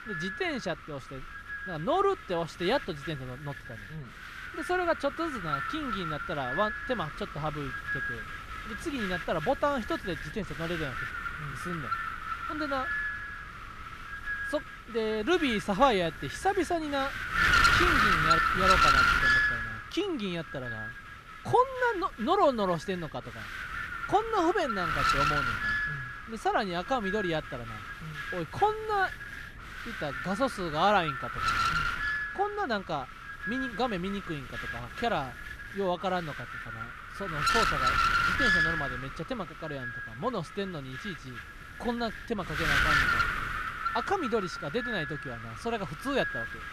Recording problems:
wind noise on the microphone; heavy; 3 dB above the speech

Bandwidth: 14.5 kHz